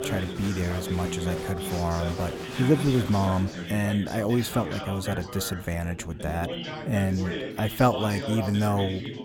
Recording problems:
chatter from many people; loud; throughout; 7 dB below the speech

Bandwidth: 18 kHz